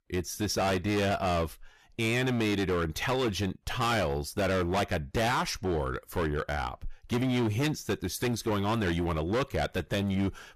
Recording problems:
distortion; heavy; 19% of the sound clipped

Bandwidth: 14.5 kHz